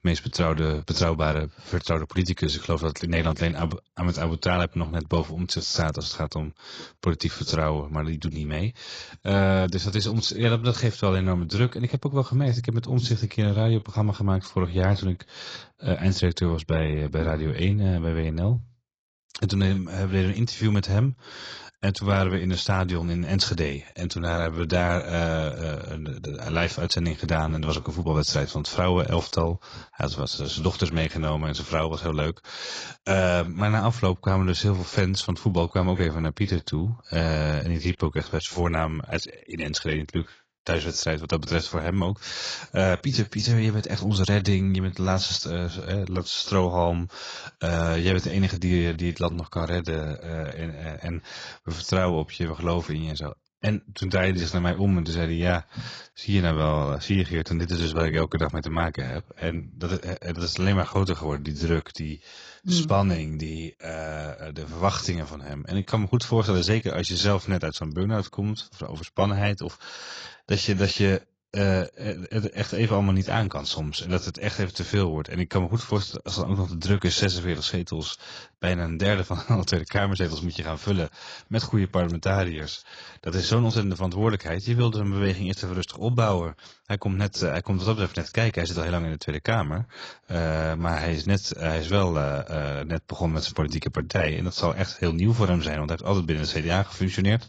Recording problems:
garbled, watery; badly; nothing above 7.5 kHz

